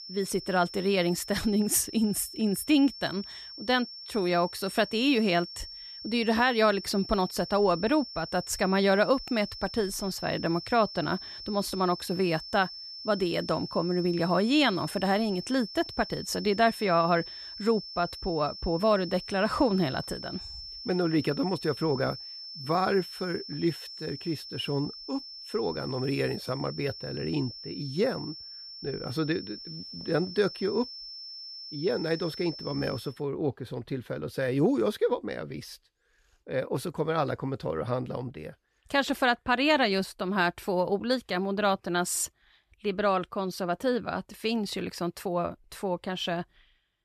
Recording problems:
high-pitched whine; noticeable; until 33 s; 5.5 kHz, 10 dB below the speech

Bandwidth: 13.5 kHz